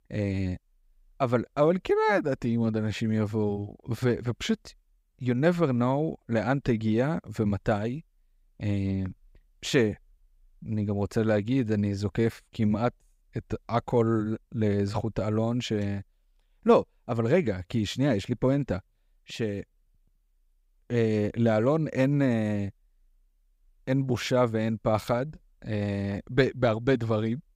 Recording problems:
none

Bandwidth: 15.5 kHz